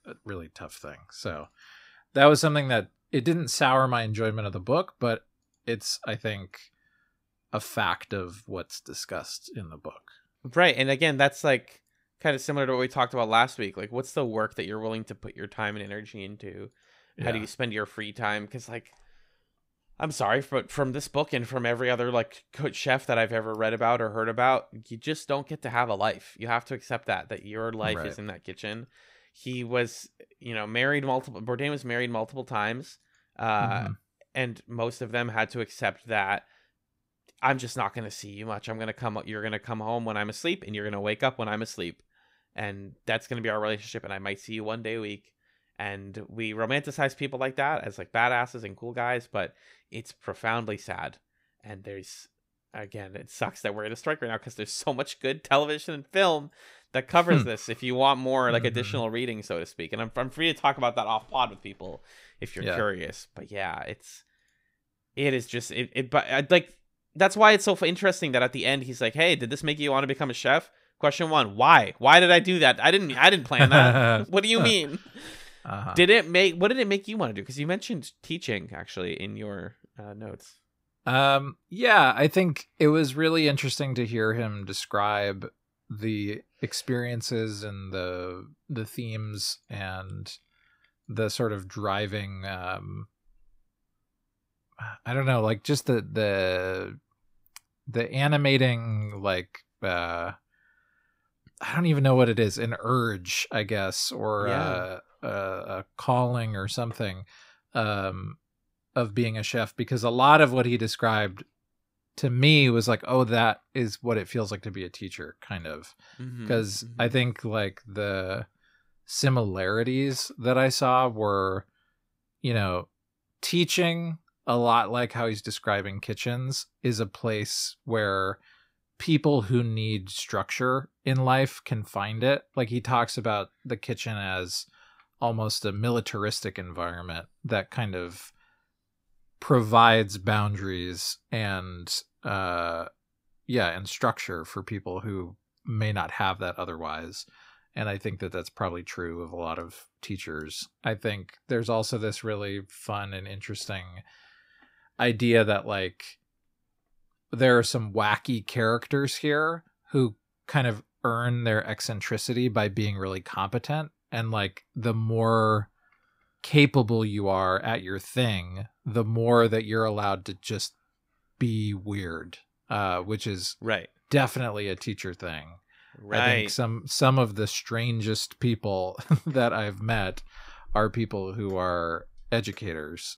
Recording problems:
none

